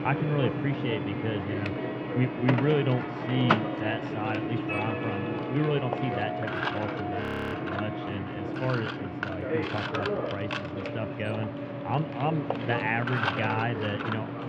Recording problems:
muffled; very; fading above 3 kHz
machinery noise; loud; throughout; 1 dB below the speech
background music; loud; throughout; 6 dB below the speech
audio freezing; at 7 s

